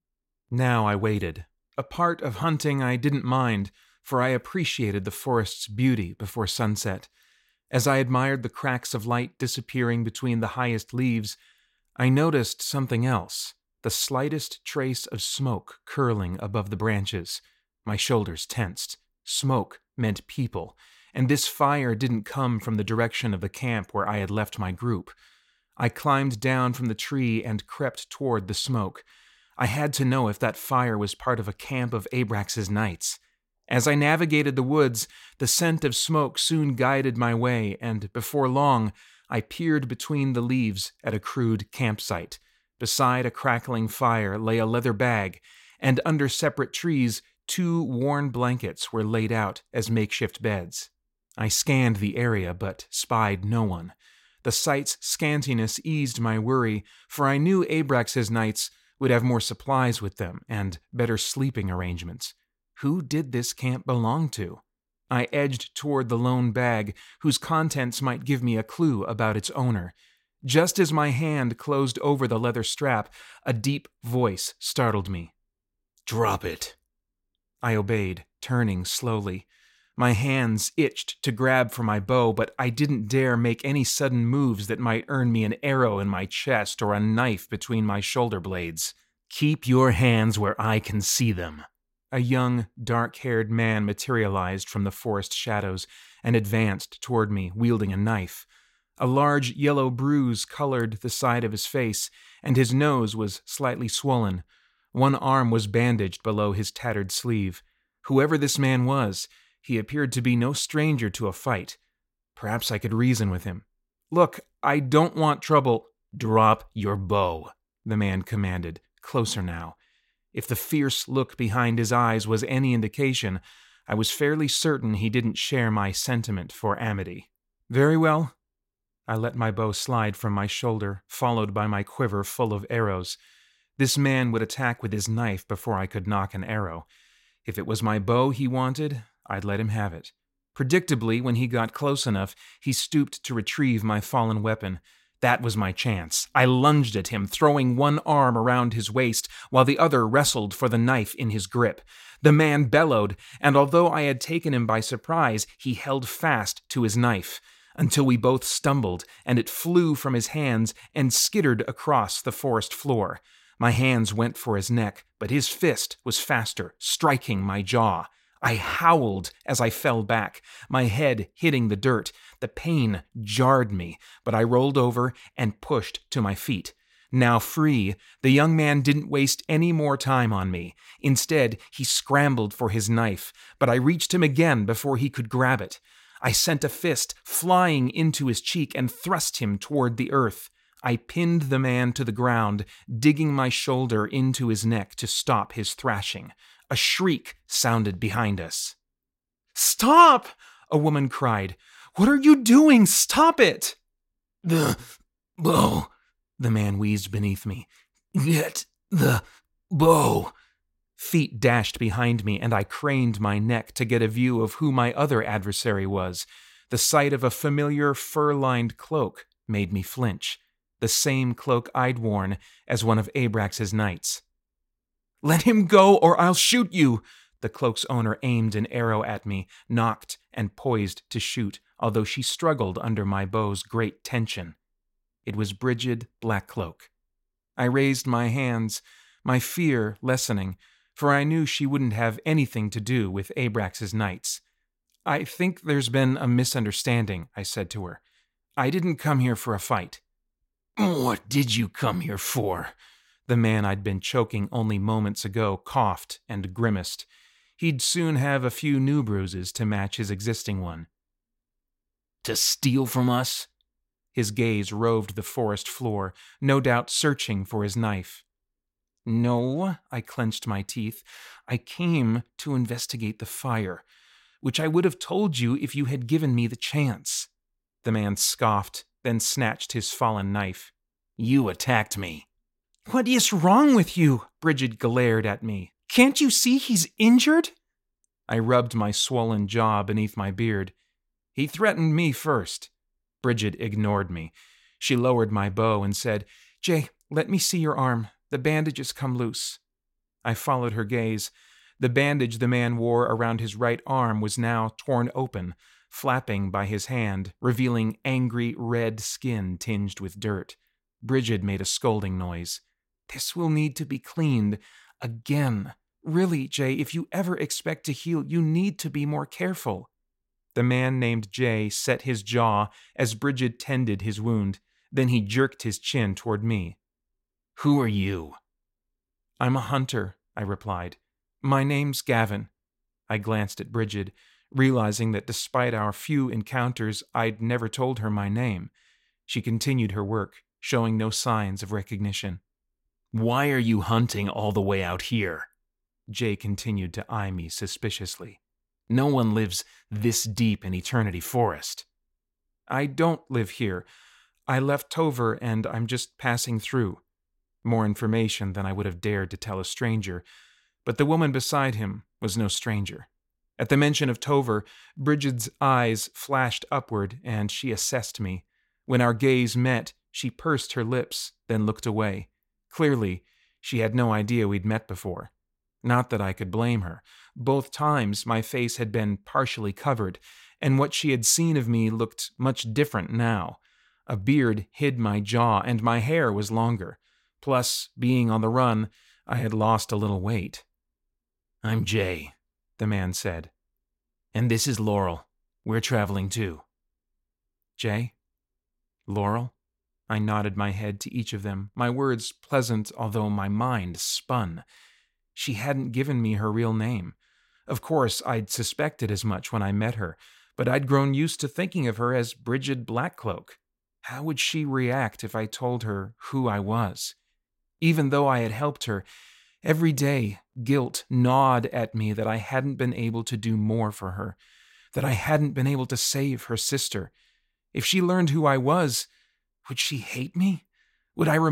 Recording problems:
abrupt cut into speech; at the end

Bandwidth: 16 kHz